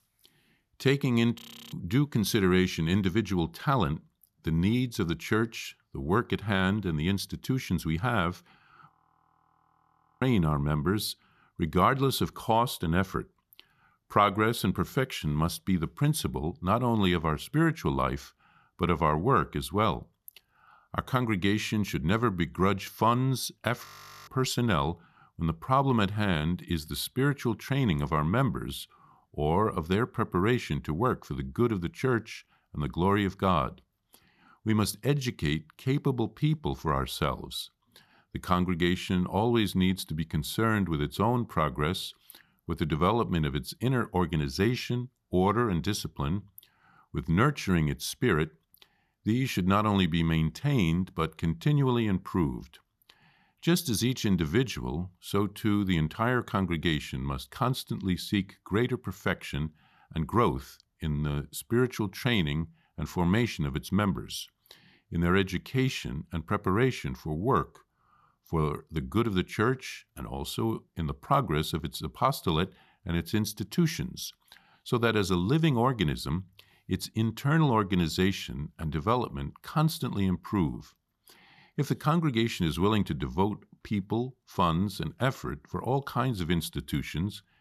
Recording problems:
audio freezing; at 1.5 s, at 9 s for 1.5 s and at 24 s

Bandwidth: 14 kHz